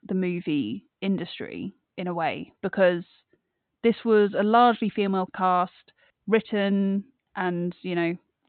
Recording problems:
high frequencies cut off; severe; nothing above 4 kHz

